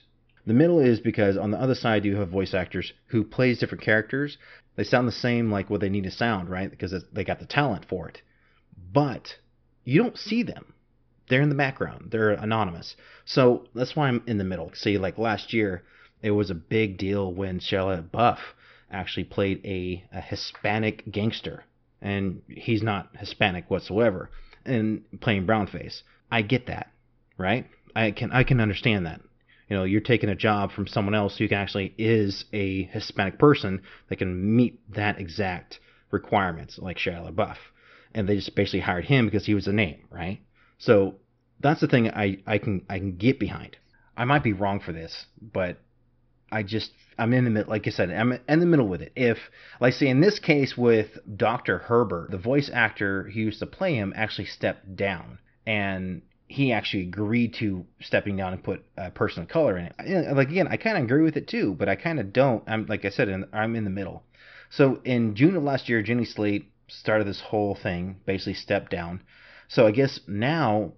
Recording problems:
high frequencies cut off; noticeable; nothing above 5.5 kHz

